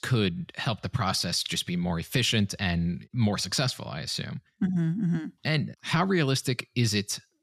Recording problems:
none

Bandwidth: 14 kHz